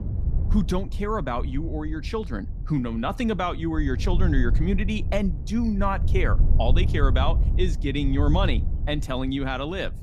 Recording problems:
wind noise on the microphone; occasional gusts; 15 dB below the speech

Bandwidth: 15 kHz